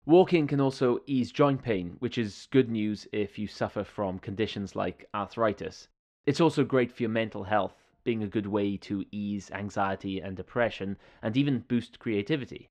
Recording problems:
muffled; slightly; fading above 3 kHz

